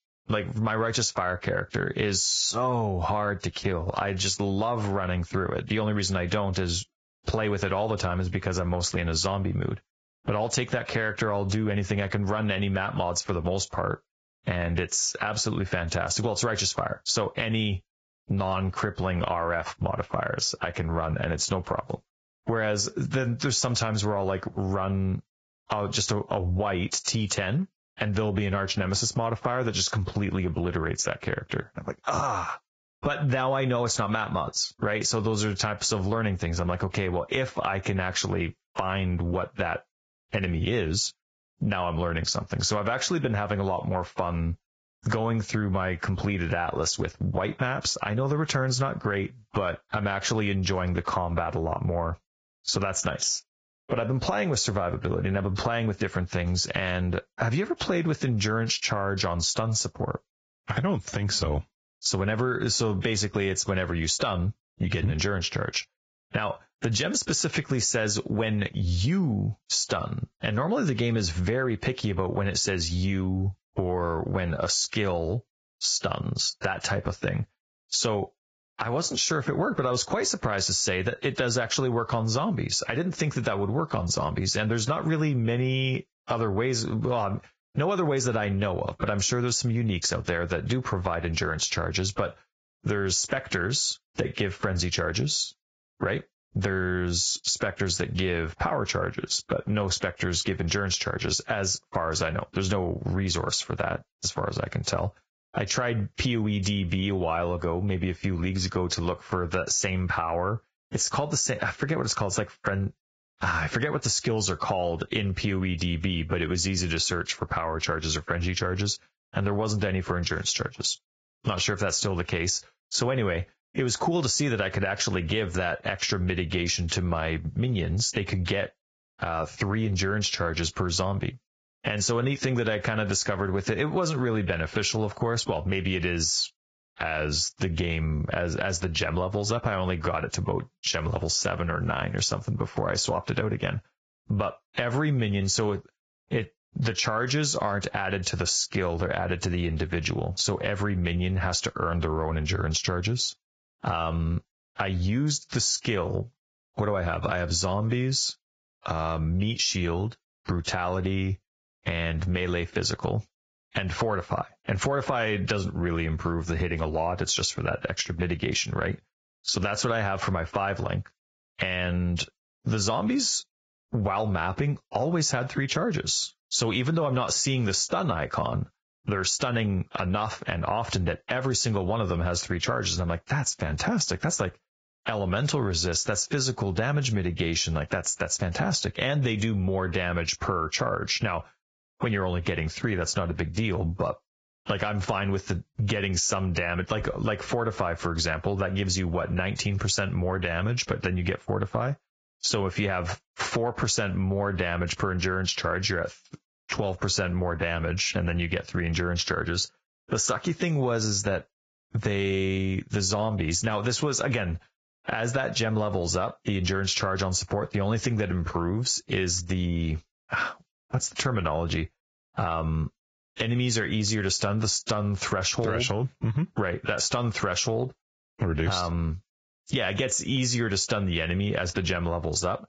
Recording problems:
garbled, watery; badly; nothing above 7.5 kHz
squashed, flat; somewhat

